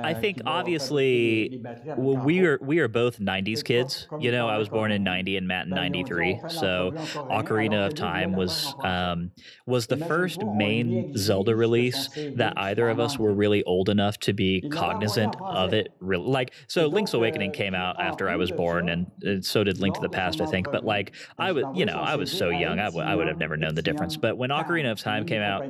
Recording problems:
voice in the background; loud; throughout; 9 dB below the speech

